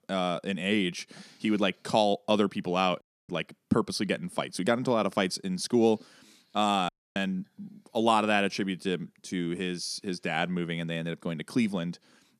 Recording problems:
audio cutting out; at 3 s and at 7 s

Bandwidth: 14.5 kHz